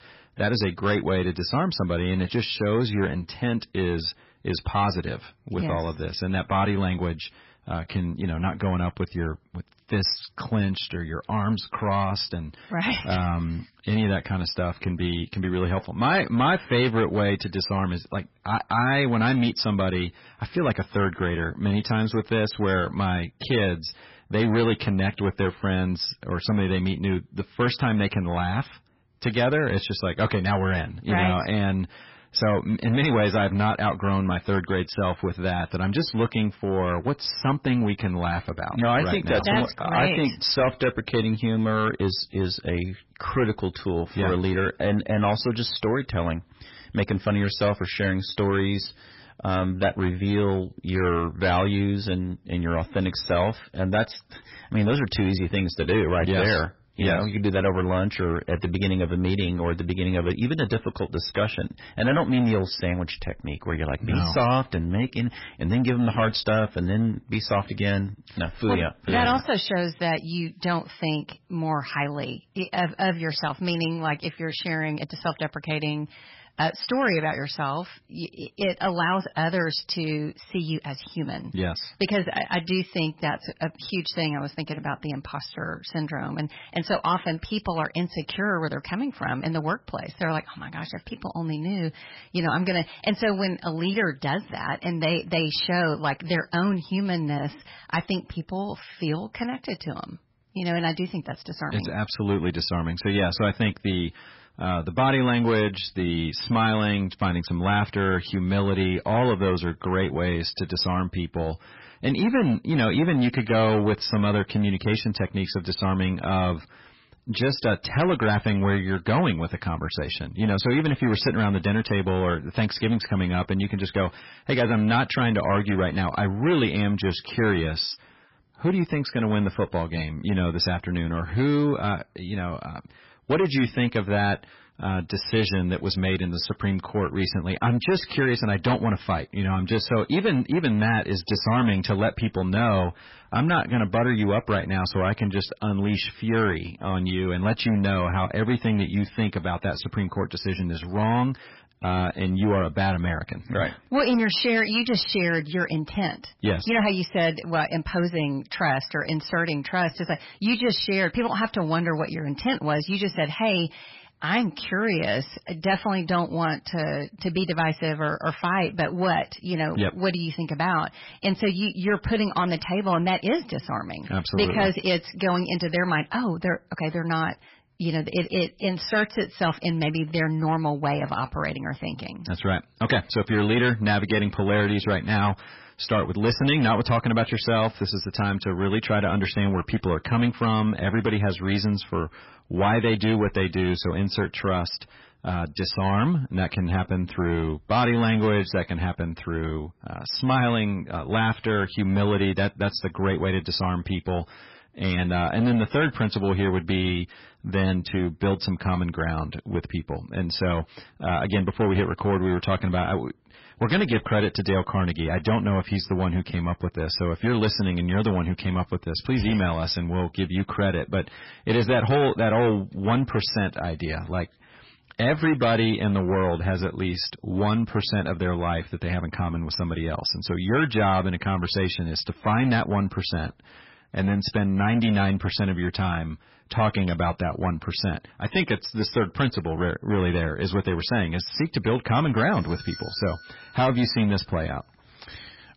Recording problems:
garbled, watery; badly; nothing above 5.5 kHz
distortion; slight; 7% of the sound clipped
doorbell; faint; from 4:02 to 4:04; peak 15 dB below the speech

